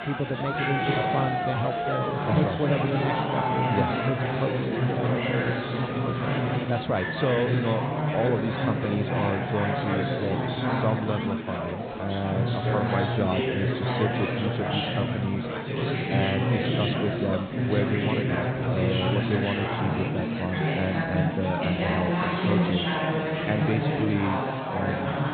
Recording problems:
high frequencies cut off; severe; nothing above 4 kHz
chatter from many people; very loud; throughout; 3 dB above the speech

